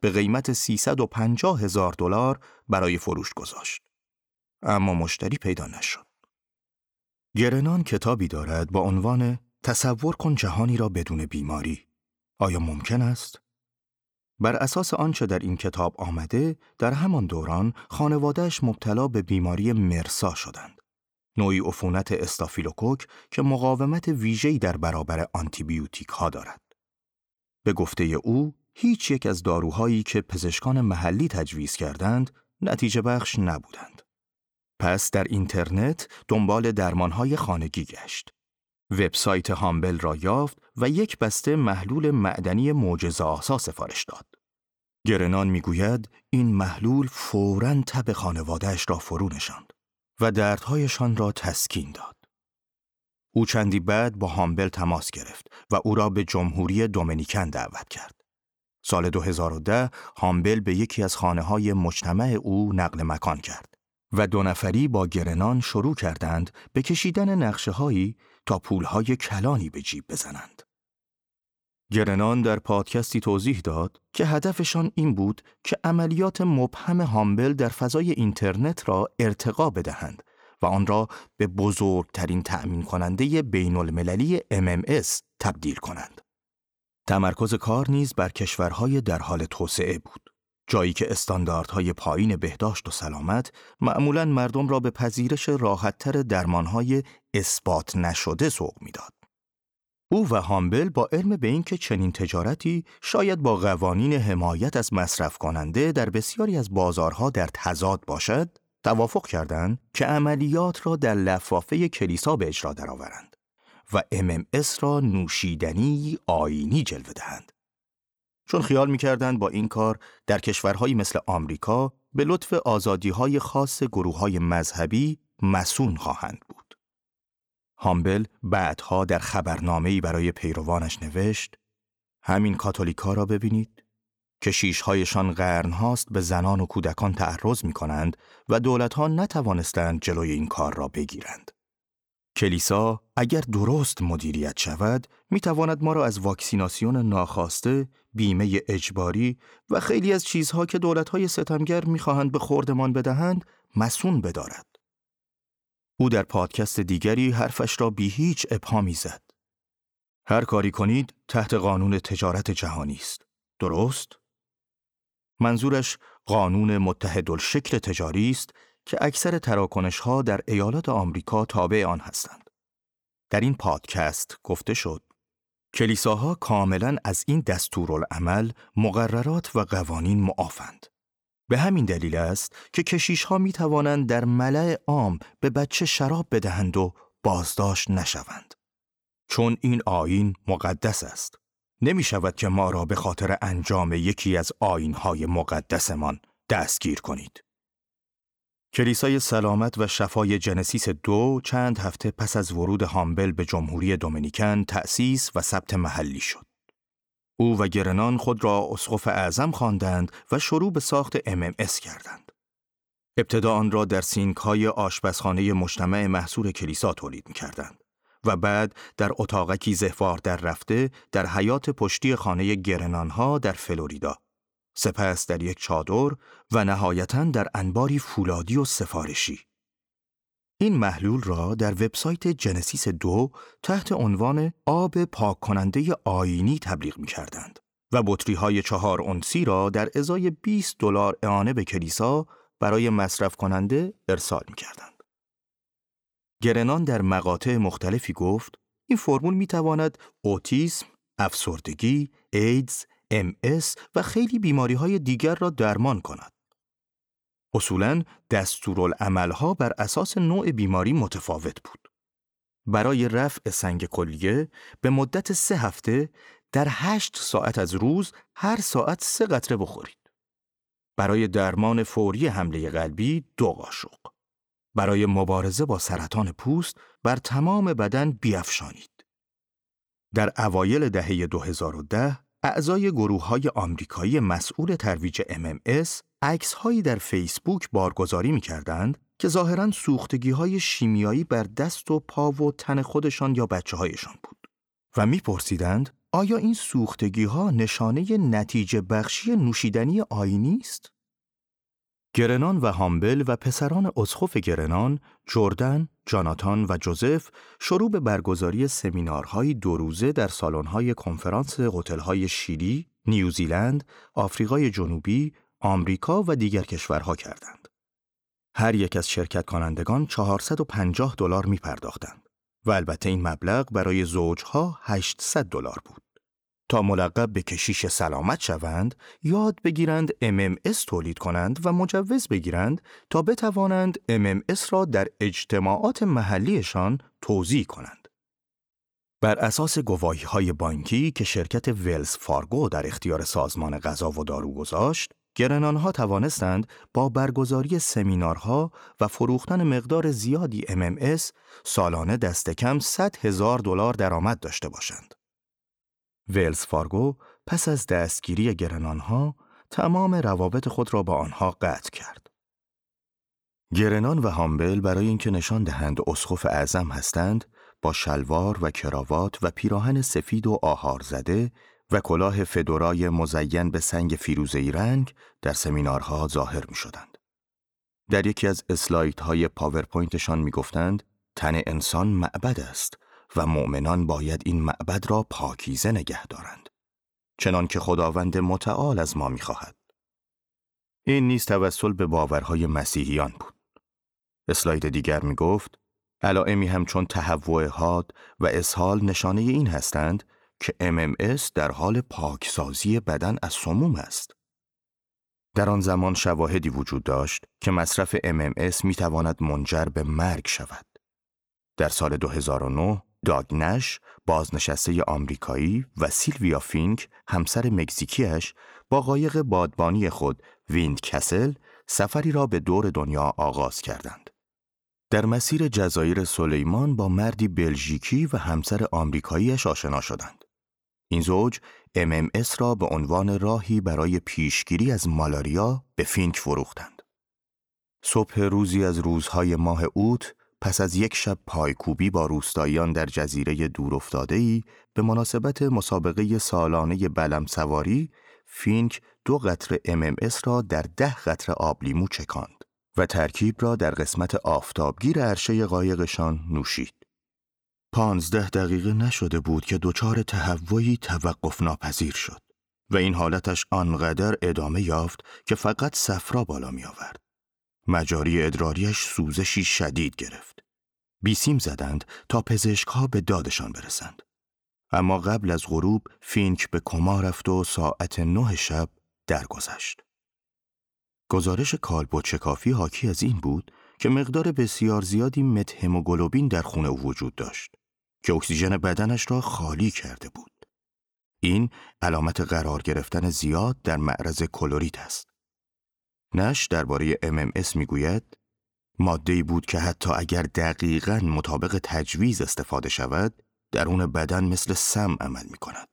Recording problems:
none

